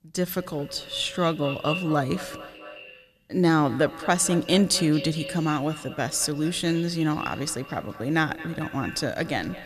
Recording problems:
echo of what is said; noticeable; throughout; 220 ms later, 15 dB below the speech

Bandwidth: 13.5 kHz